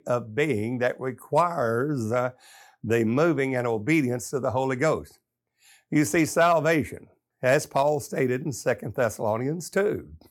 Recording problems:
none

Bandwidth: 17.5 kHz